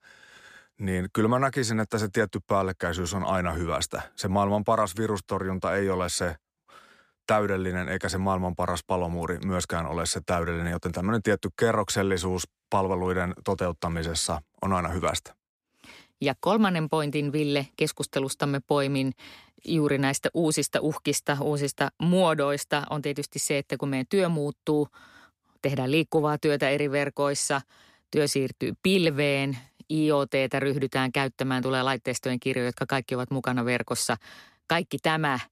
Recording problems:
none

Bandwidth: 14.5 kHz